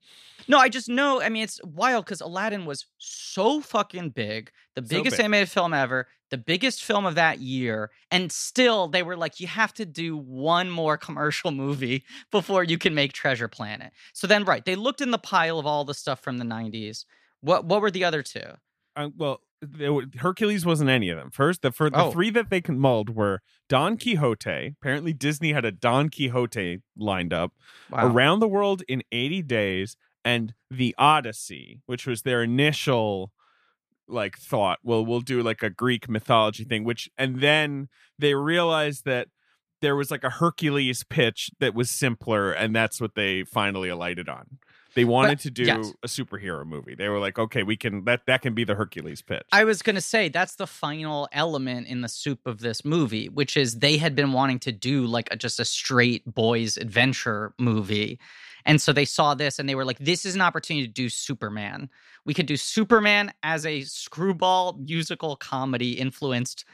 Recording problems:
none

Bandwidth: 14.5 kHz